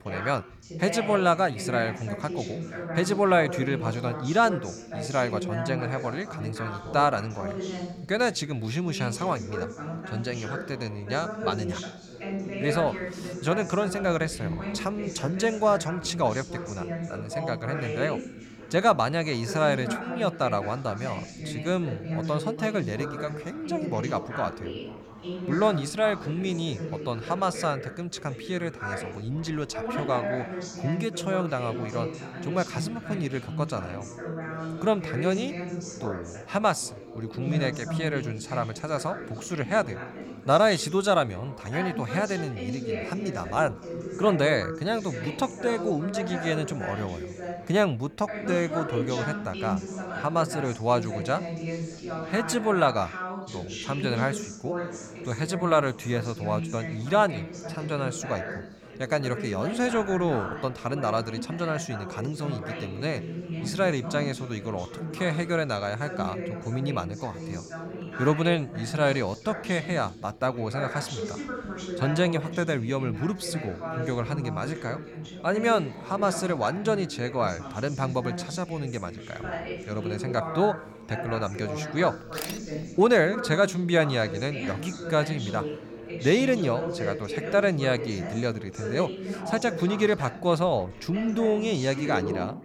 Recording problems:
background chatter; loud; throughout; 4 voices, 7 dB below the speech

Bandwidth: 18 kHz